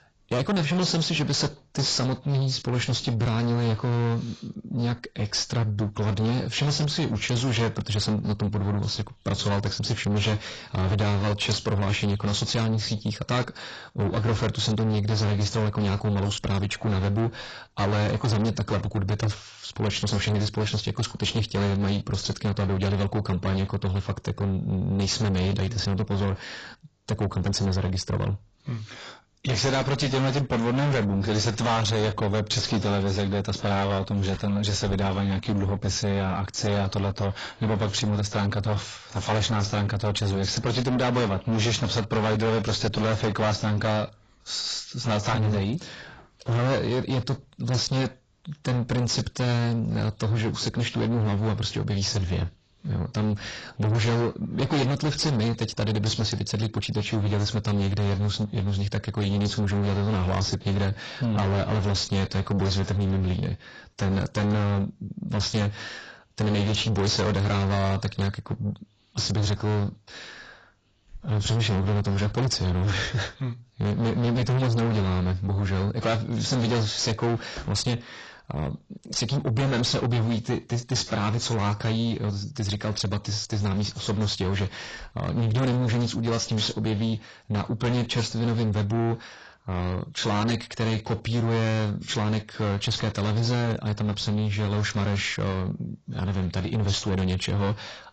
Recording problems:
distortion; heavy; 6 dB below the speech
garbled, watery; badly; nothing above 7.5 kHz

